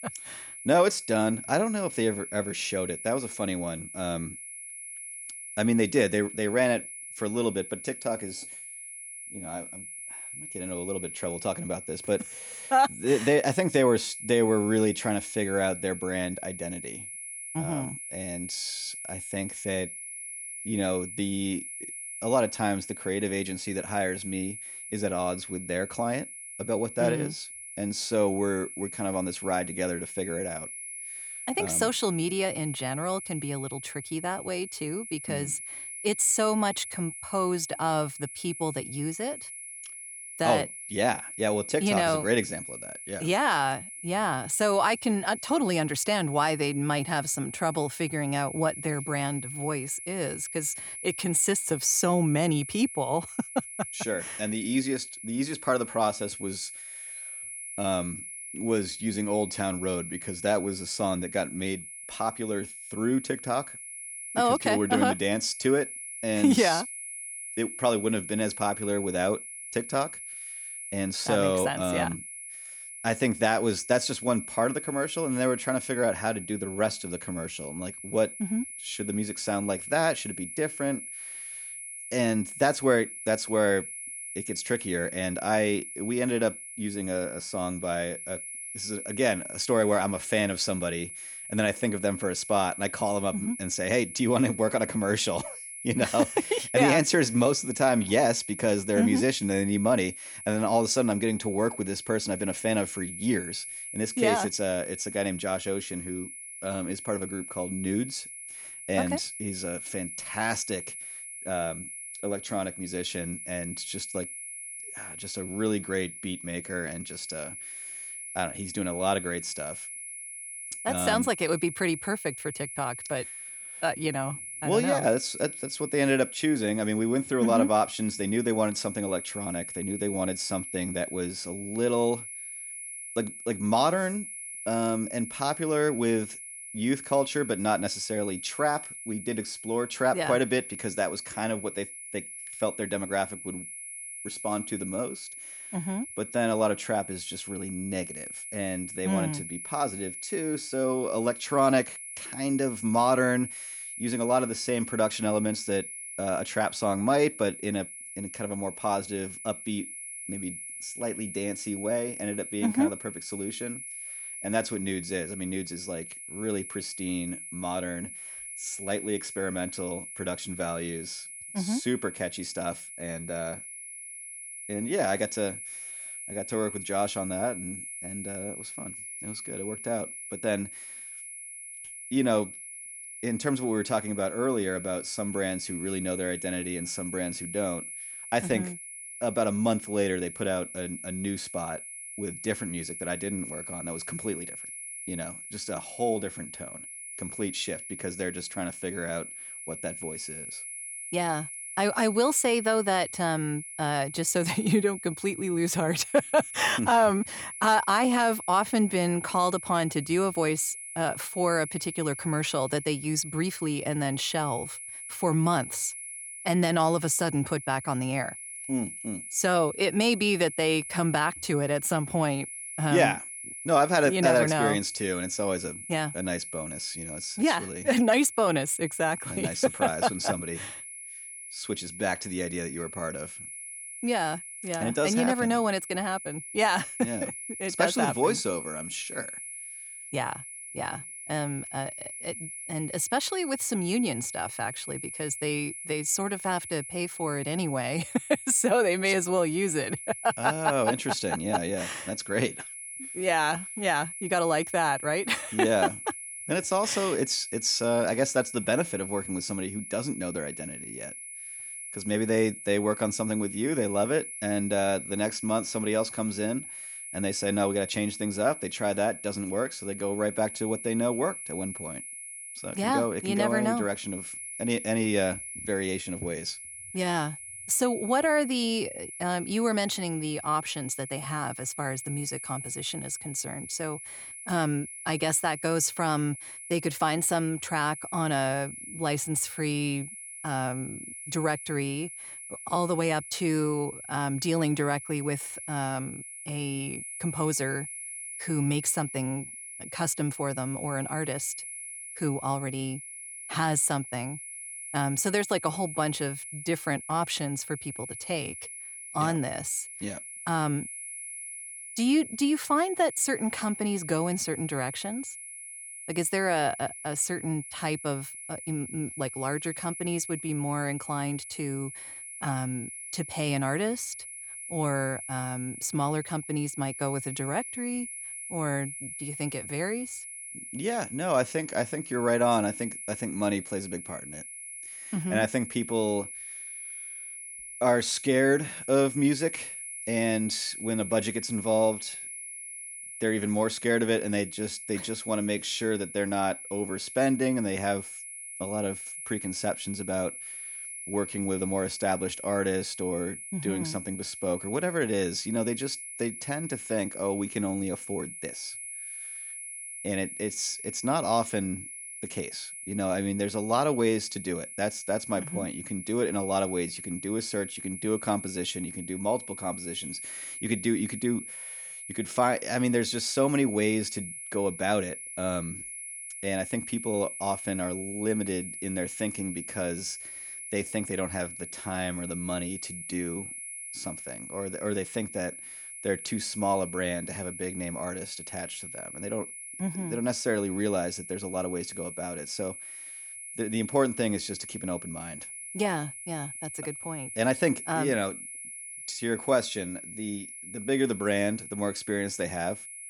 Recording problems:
high-pitched whine; loud; throughout; 10.5 kHz, 9 dB below the speech

